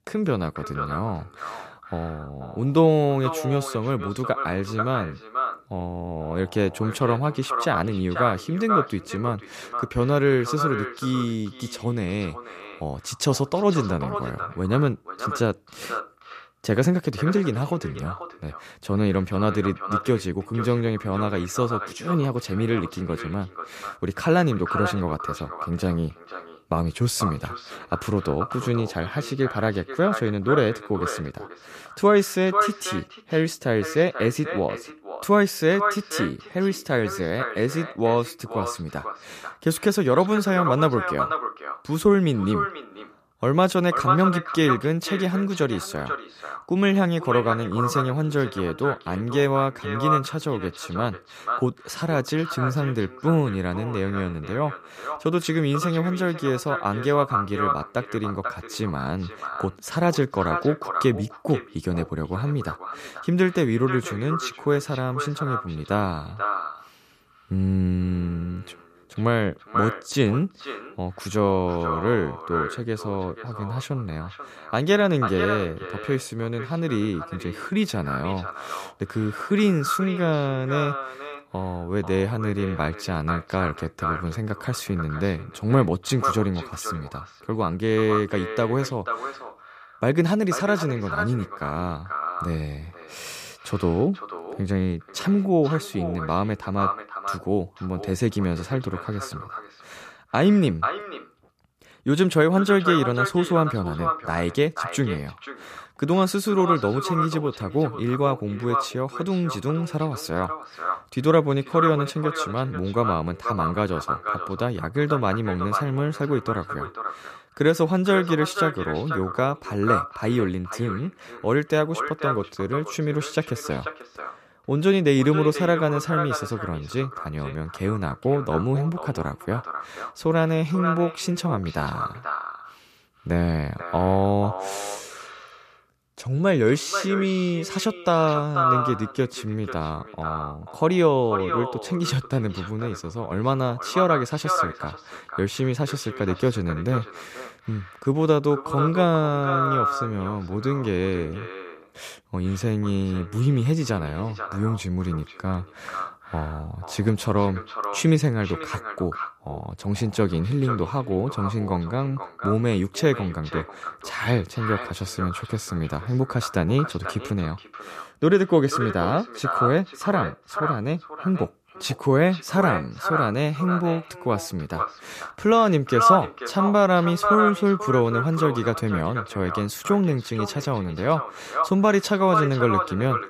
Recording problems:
echo of what is said; strong; throughout; 490 ms later, 6 dB below the speech

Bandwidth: 14.5 kHz